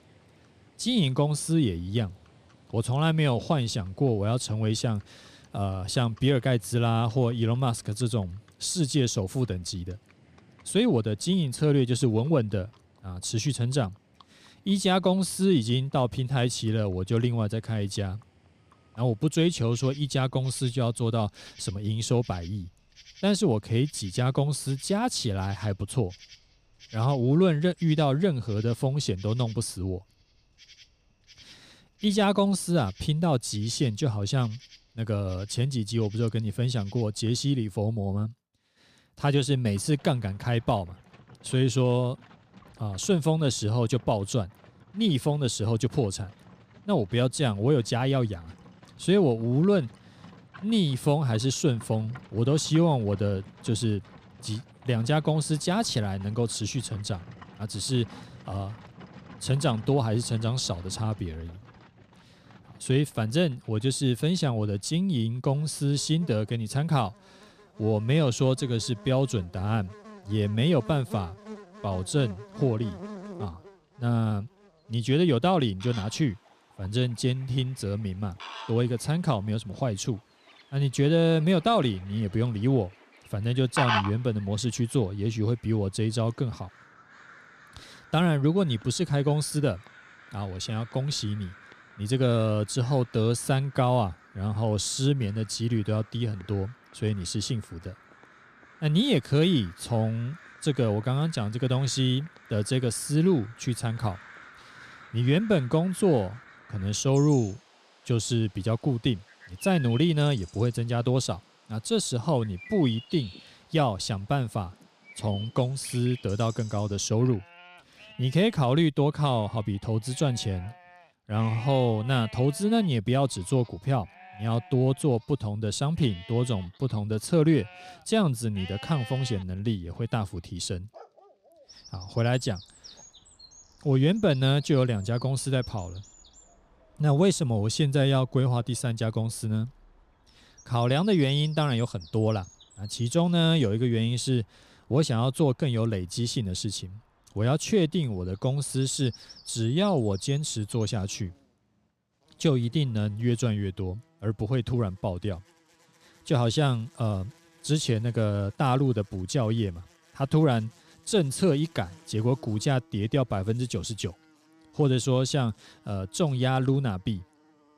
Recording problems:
animal sounds; noticeable; throughout; 20 dB below the speech

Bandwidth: 15 kHz